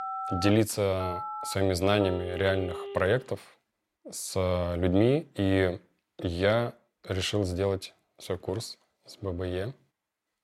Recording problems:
alarms or sirens; very faint; until 3 s; 9 dB below the speech

